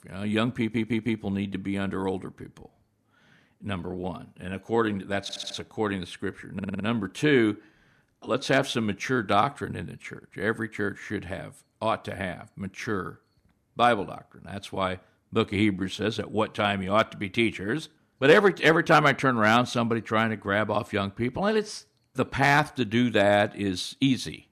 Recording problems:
audio stuttering; at 0.5 s, at 5 s and at 6.5 s

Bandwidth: 14.5 kHz